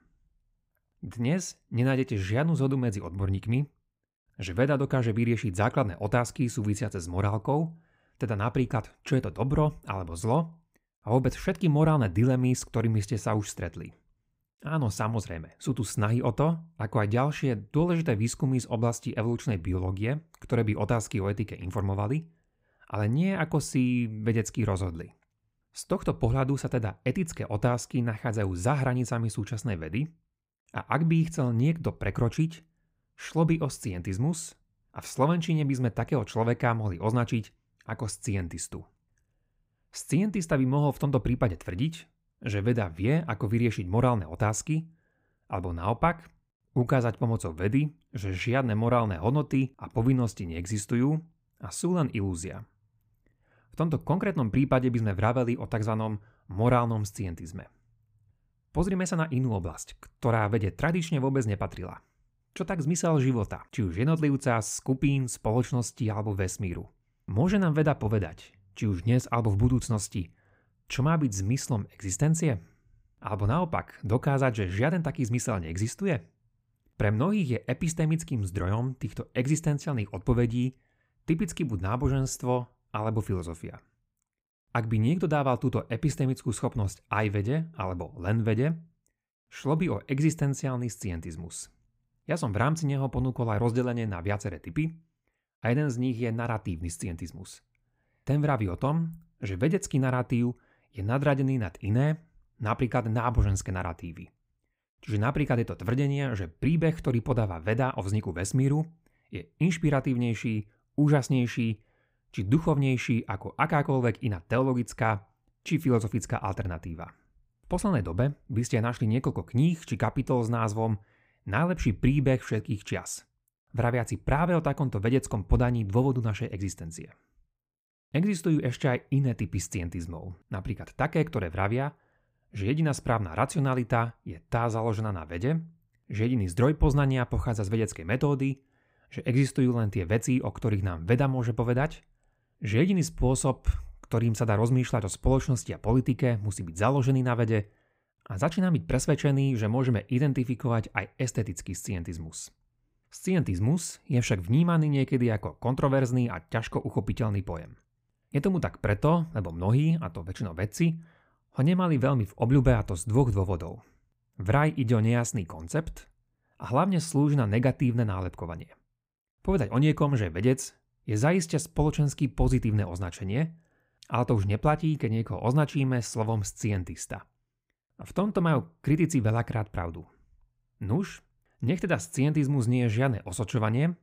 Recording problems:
none

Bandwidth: 15.5 kHz